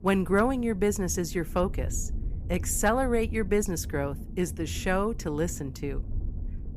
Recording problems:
low rumble; faint; throughout; 20 dB below the speech

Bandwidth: 15 kHz